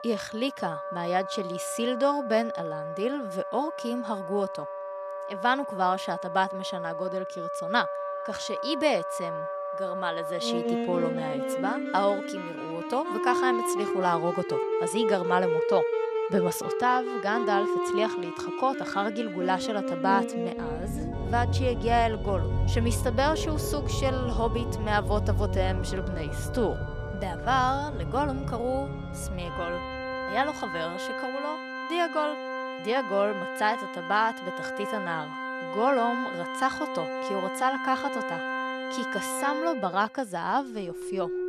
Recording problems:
background music; loud; throughout; 2 dB below the speech

